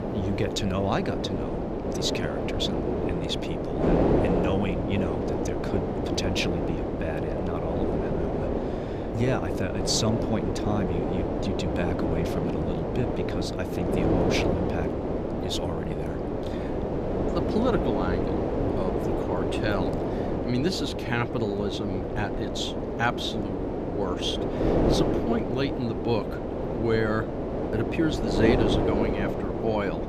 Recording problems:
wind noise on the microphone; heavy; 2 dB above the speech

